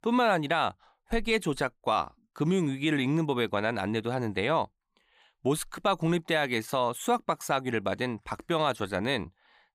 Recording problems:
none

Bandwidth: 15 kHz